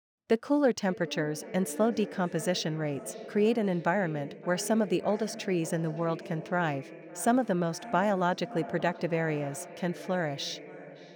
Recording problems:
echo of what is said; noticeable; throughout; 570 ms later, 15 dB below the speech

